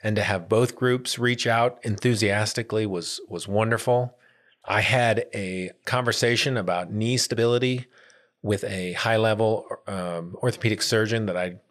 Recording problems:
uneven, jittery; slightly; from 4.5 to 8.5 s

